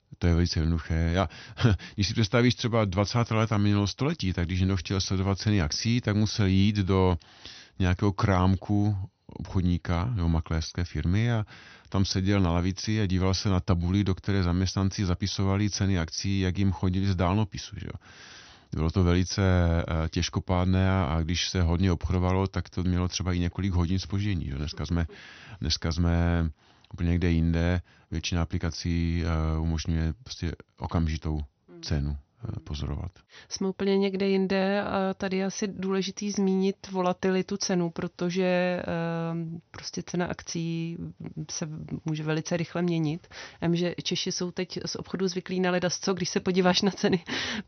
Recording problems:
high frequencies cut off; noticeable; nothing above 6 kHz

